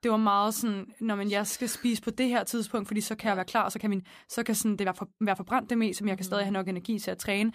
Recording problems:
uneven, jittery; strongly; from 1.5 to 6.5 s

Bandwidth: 15 kHz